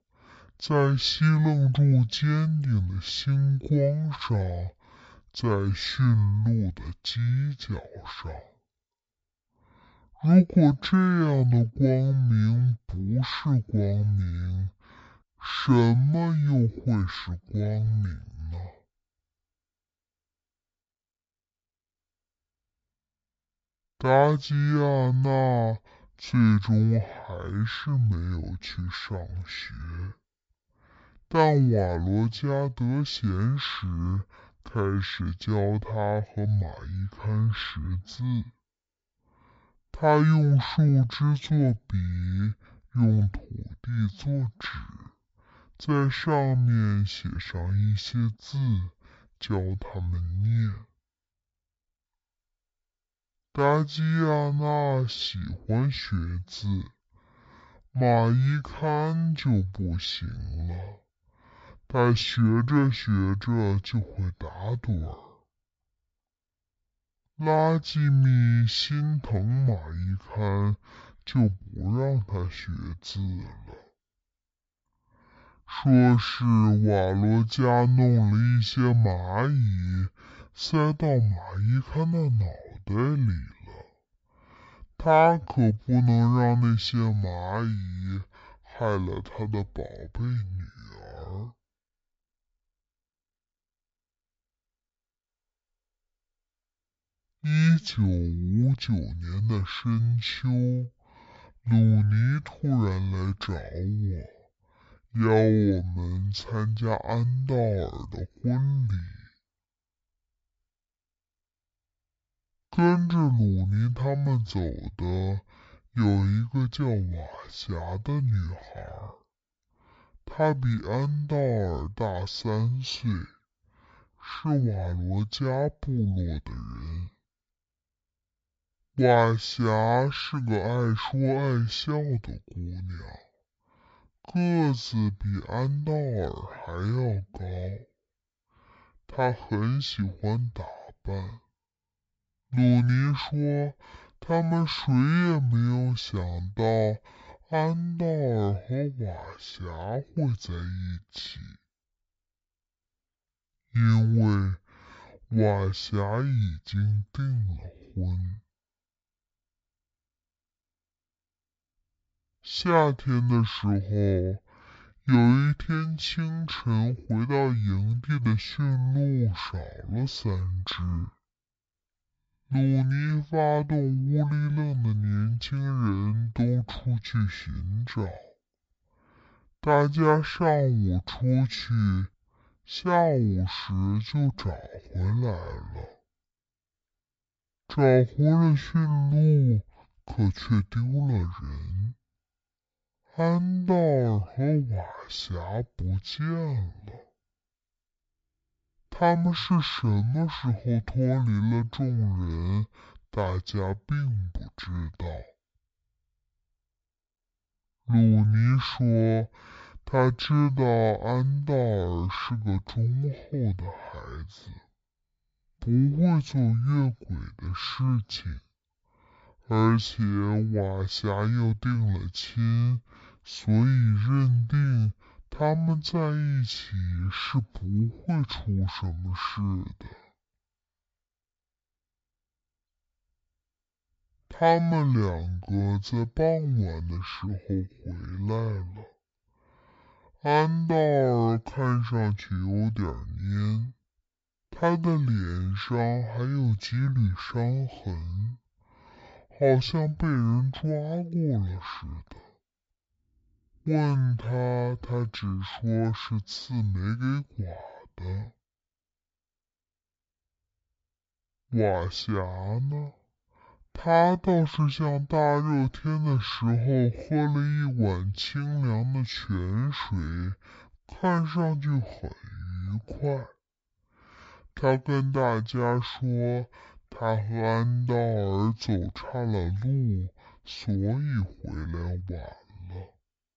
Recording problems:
wrong speed and pitch; too slow and too low; 0.5 times normal speed

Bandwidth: 7.5 kHz